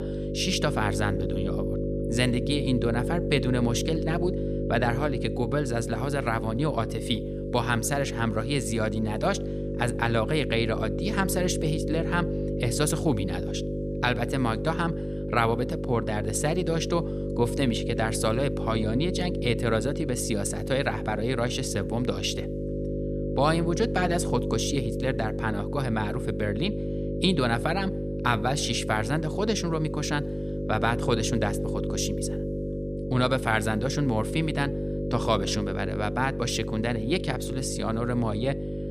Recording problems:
electrical hum; loud; throughout; 50 Hz, 6 dB below the speech

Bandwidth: 14.5 kHz